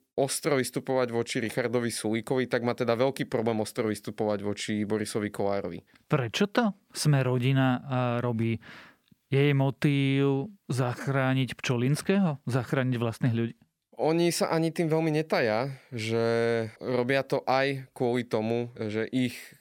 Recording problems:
none

